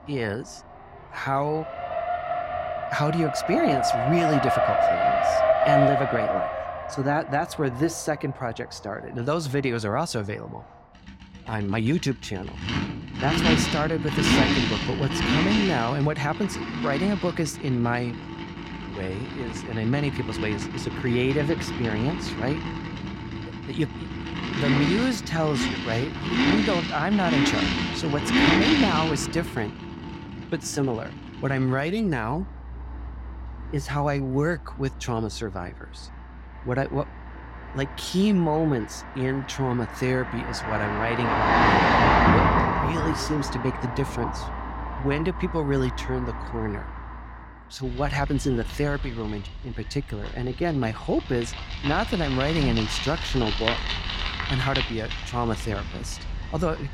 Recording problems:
traffic noise; very loud; throughout; 1 dB above the speech

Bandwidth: 16 kHz